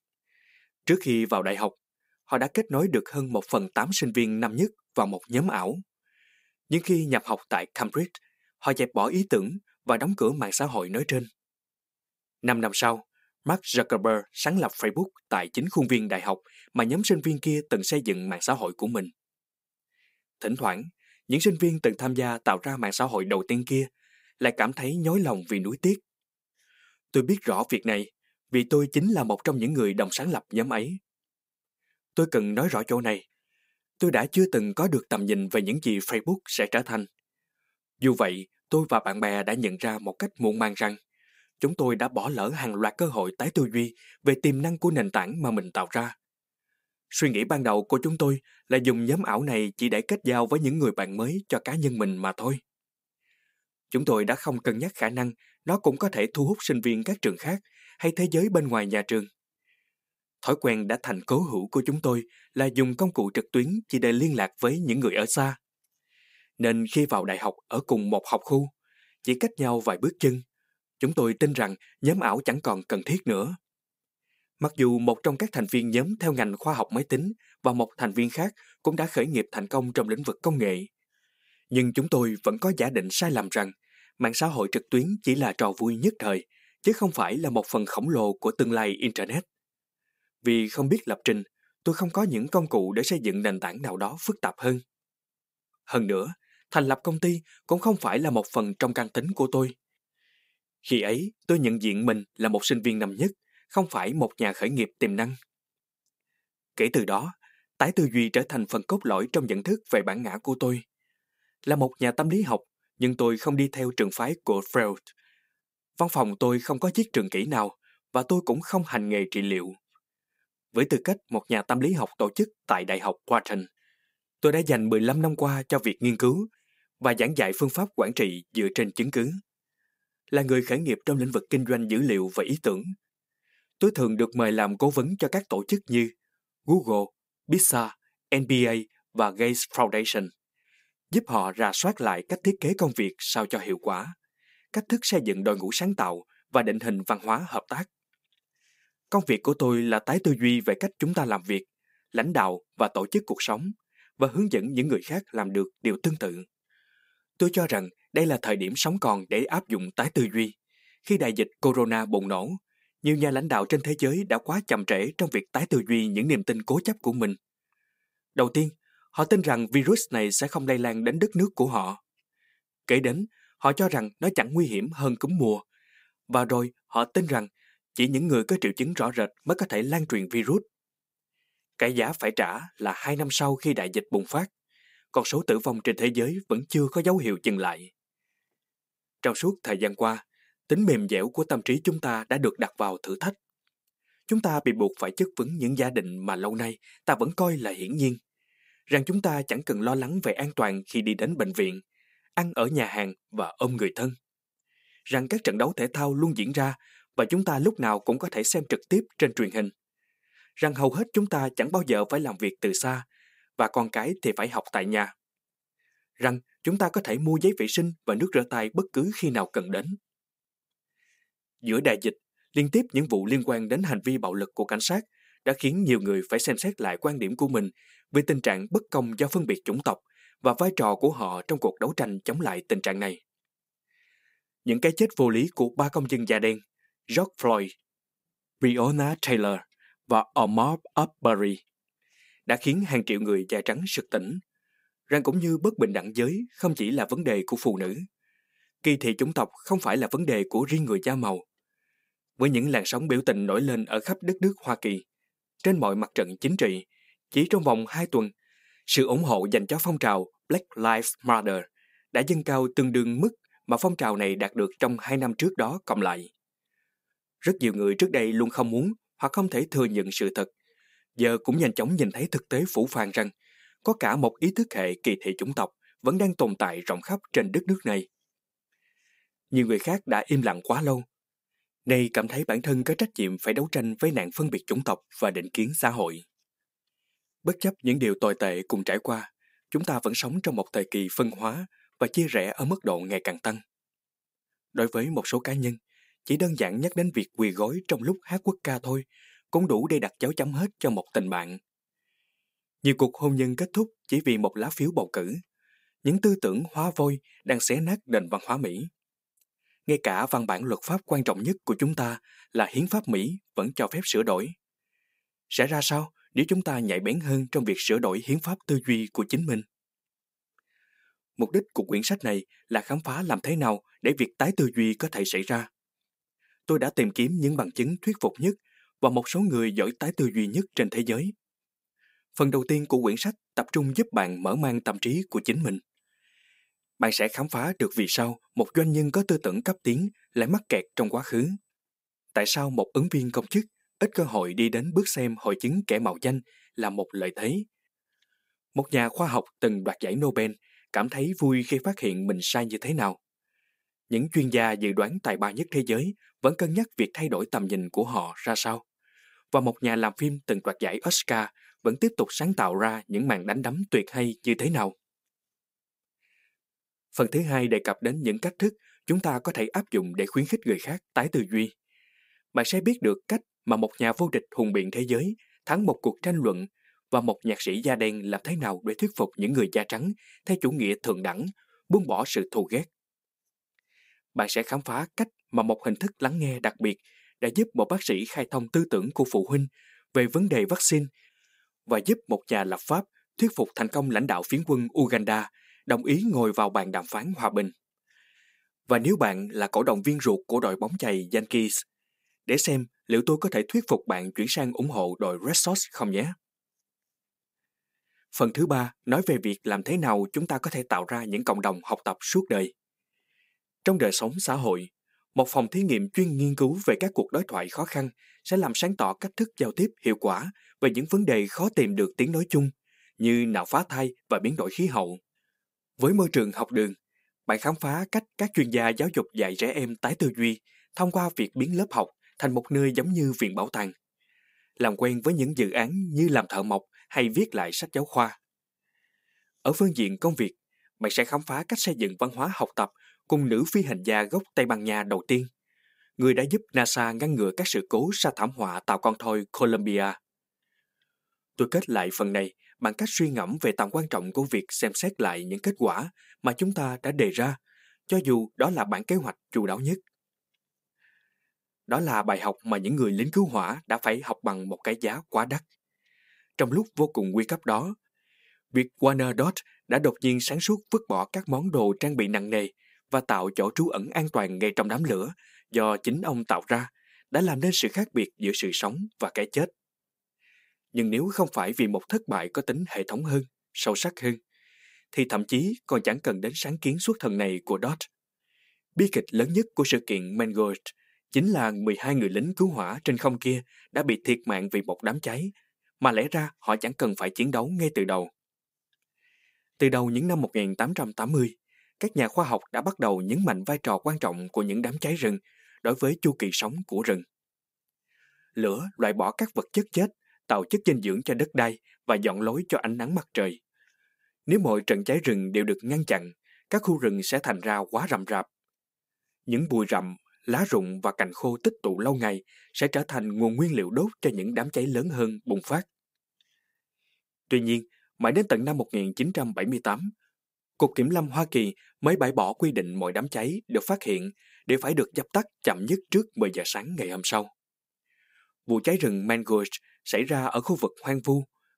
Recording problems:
none

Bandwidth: 15.5 kHz